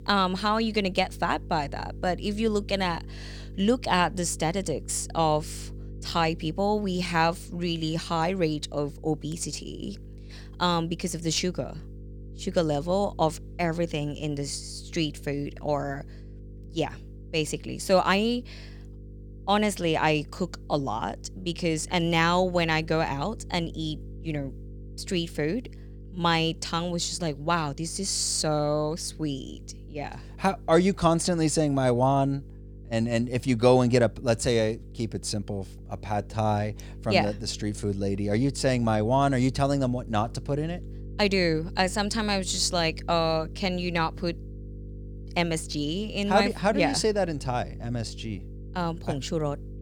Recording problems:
electrical hum; faint; throughout; 50 Hz, 25 dB below the speech

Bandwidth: 19 kHz